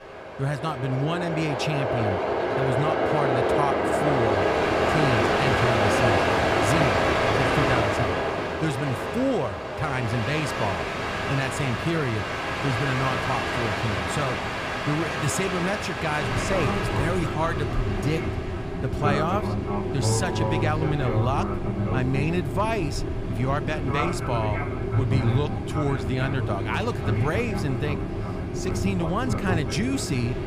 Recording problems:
train or aircraft noise; very loud; throughout; 2 dB above the speech
dog barking; noticeable; from 17 to 23 s; peak 8 dB below the speech

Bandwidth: 15 kHz